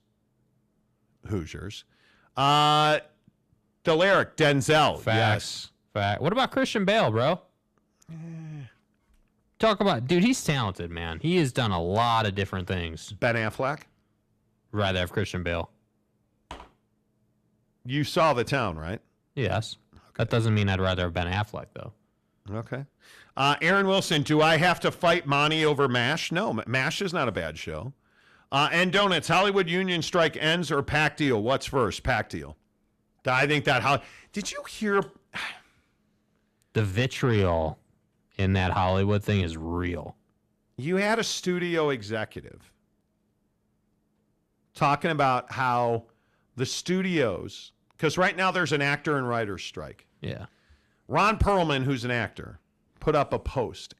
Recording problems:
distortion; slight; 10 dB below the speech

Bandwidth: 14 kHz